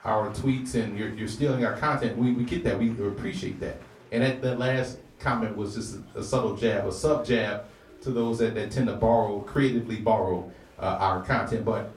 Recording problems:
off-mic speech; far
room echo; slight; dies away in 0.3 s
murmuring crowd; faint; throughout; 25 dB below the speech

